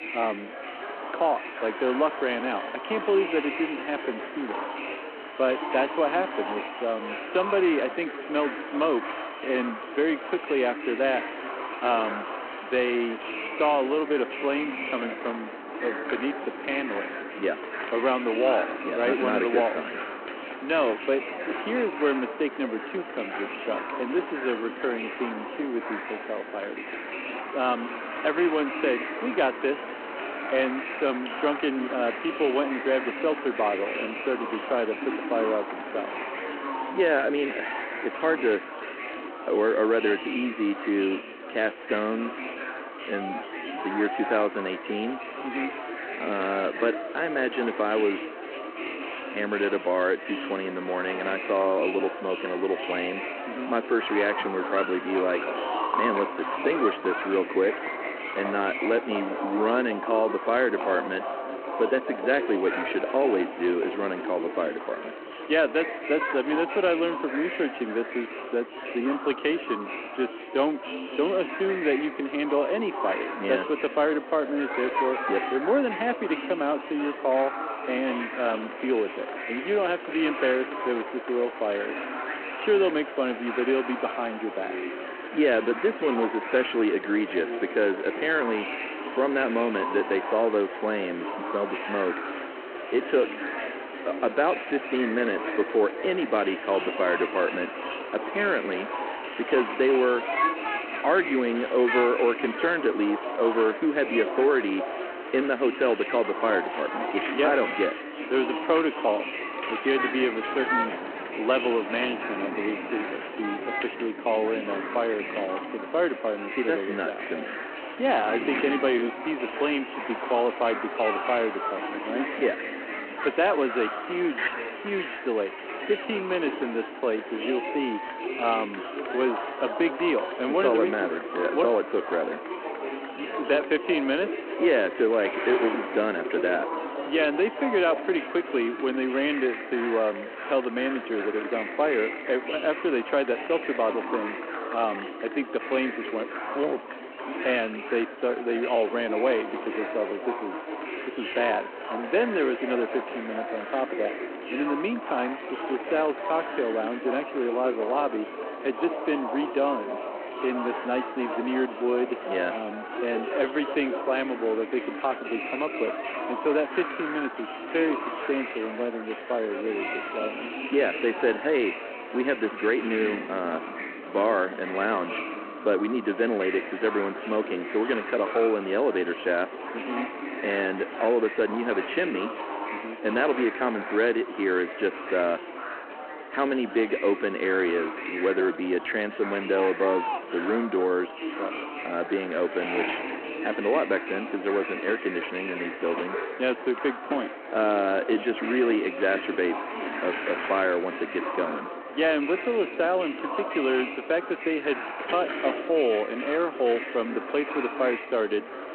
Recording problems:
echo of what is said; faint; throughout; 360 ms later, 20 dB below the speech
phone-call audio
murmuring crowd; loud; throughout; 7 dB below the speech
rain or running water; noticeable; throughout; 15 dB below the speech

